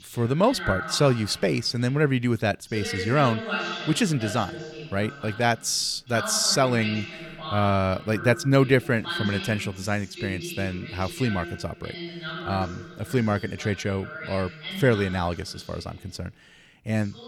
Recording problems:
voice in the background; loud; throughout; 9 dB below the speech

